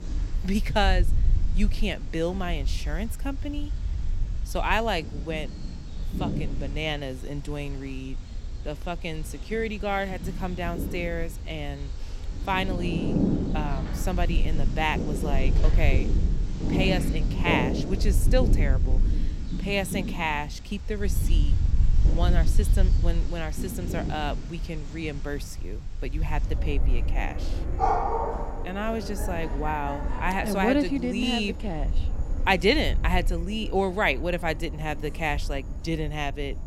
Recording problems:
animal sounds; loud; throughout; 4 dB below the speech
wind noise on the microphone; occasional gusts; 20 dB below the speech

